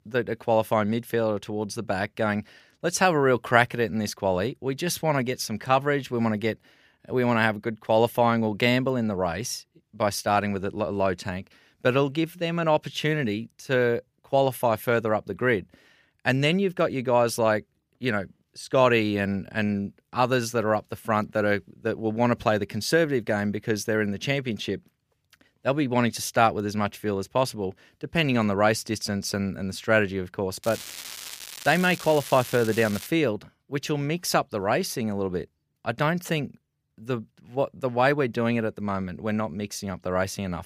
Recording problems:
crackling; noticeable; from 31 to 33 s; 10 dB below the speech

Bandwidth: 15 kHz